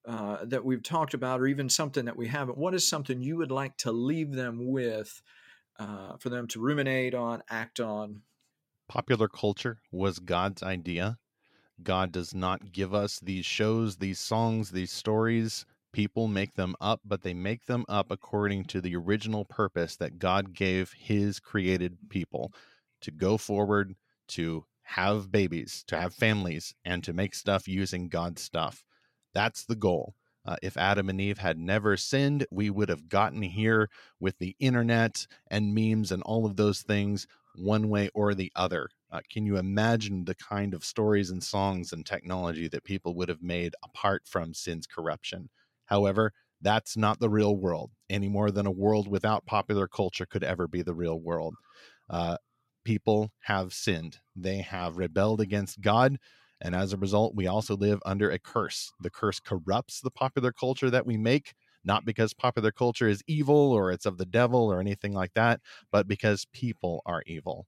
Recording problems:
none

